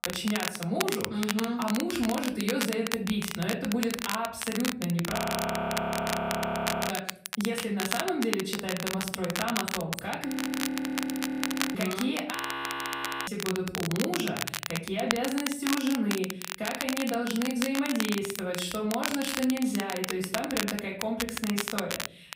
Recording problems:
off-mic speech; far
room echo; slight; dies away in 0.6 s
crackle, like an old record; loud; 3 dB below the speech
audio freezing; at 5 s for 1.5 s, at 10 s for 1.5 s and at 12 s for 1 s

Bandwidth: 15.5 kHz